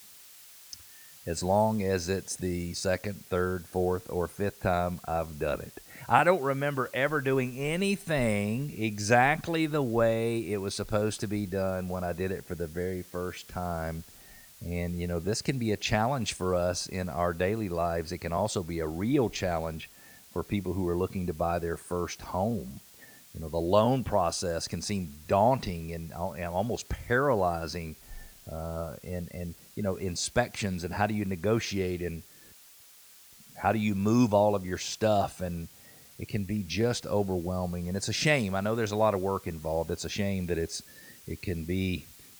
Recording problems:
hiss; noticeable; throughout; 20 dB below the speech

